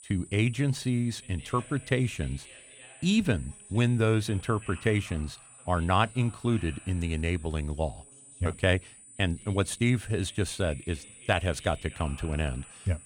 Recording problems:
high-pitched whine; noticeable; throughout; 9 kHz, 20 dB below the speech
voice in the background; faint; throughout; 25 dB below the speech

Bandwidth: 18 kHz